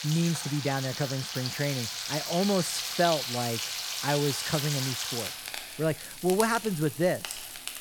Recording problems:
household noises; loud; throughout; 3 dB below the speech

